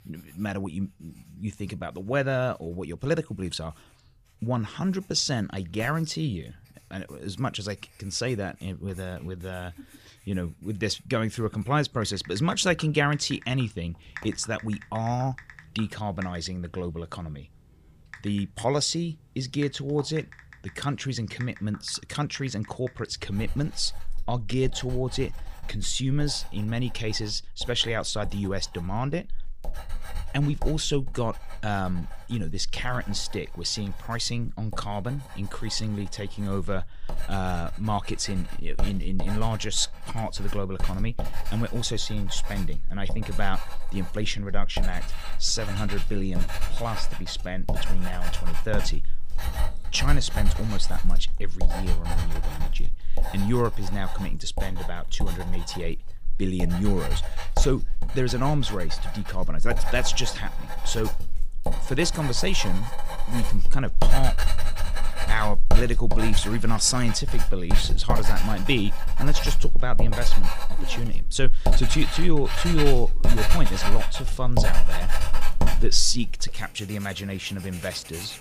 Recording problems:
household noises; loud; throughout; 3 dB below the speech

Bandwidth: 15 kHz